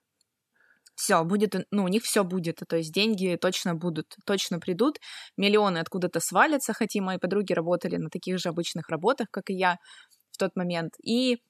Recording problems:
none

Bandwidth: 13.5 kHz